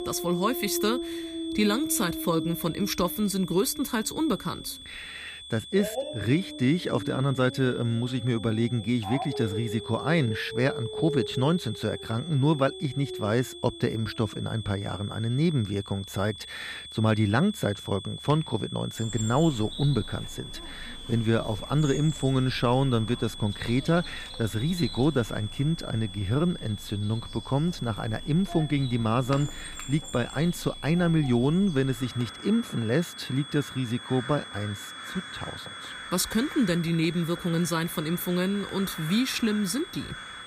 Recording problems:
high-pitched whine; noticeable; throughout; 3.5 kHz, 15 dB below the speech
animal sounds; noticeable; throughout; 15 dB below the speech

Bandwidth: 15 kHz